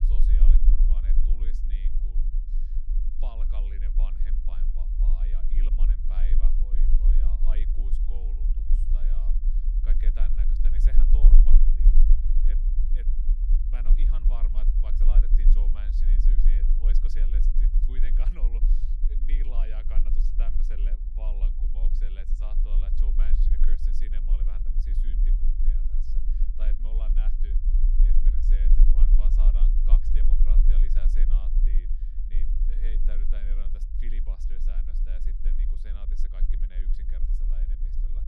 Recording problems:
low rumble; loud; throughout; 1 dB below the speech

